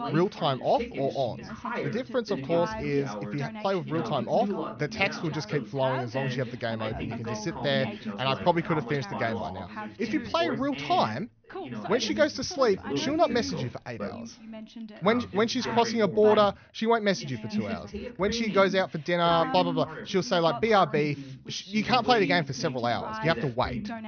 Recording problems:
high frequencies cut off; noticeable; nothing above 6.5 kHz
background chatter; loud; throughout; 2 voices, 9 dB below the speech

